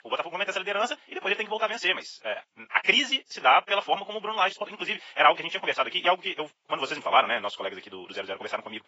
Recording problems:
garbled, watery; badly; nothing above 7.5 kHz
thin; very; fading below 750 Hz
wrong speed, natural pitch; too fast; 1.7 times normal speed

